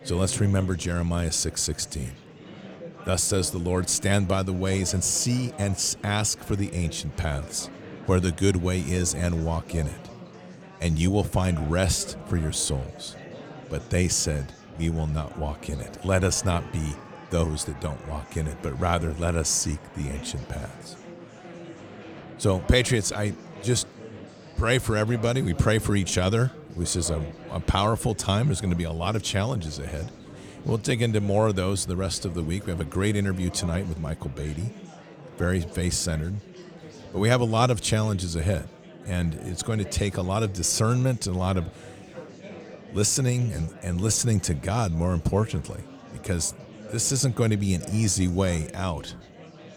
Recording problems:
murmuring crowd; noticeable; throughout; 15 dB below the speech

